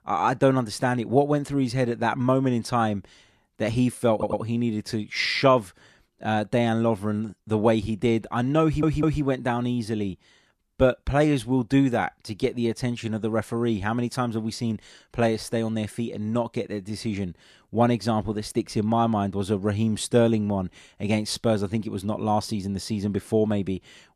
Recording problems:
audio stuttering; at 4 s and at 8.5 s

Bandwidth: 14 kHz